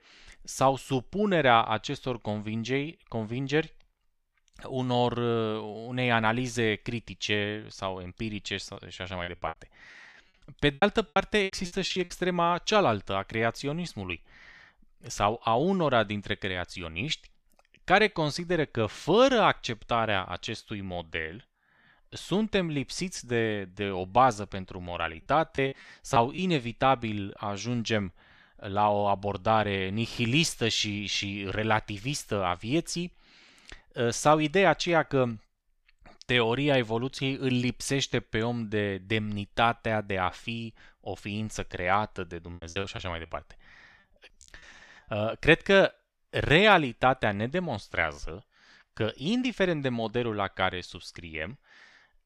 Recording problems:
choppy; very; from 8.5 to 12 s, from 25 to 26 s and from 43 to 45 s; 21% of the speech affected

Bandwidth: 14.5 kHz